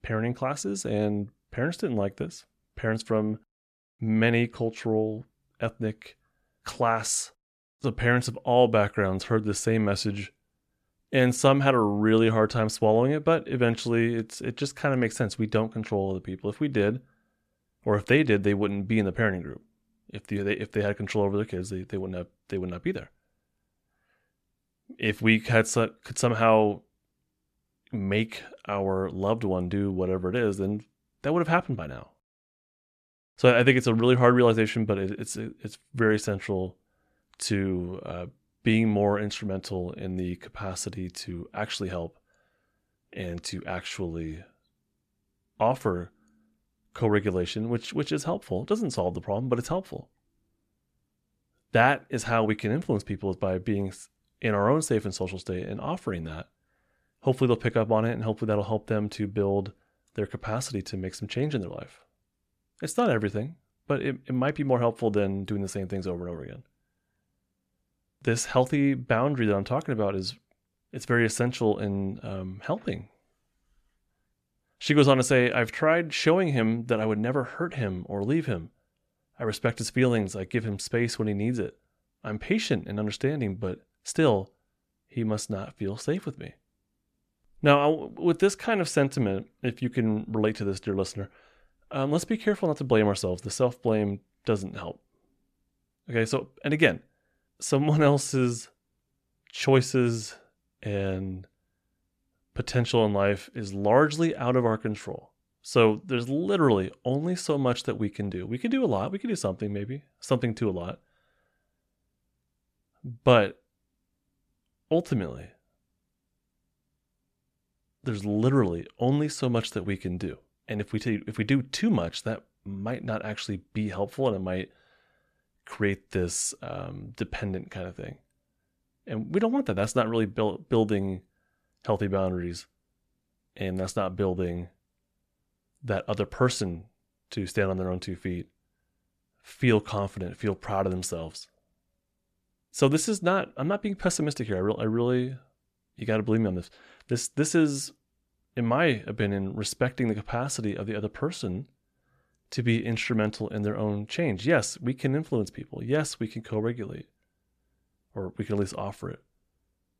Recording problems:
none

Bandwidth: 14 kHz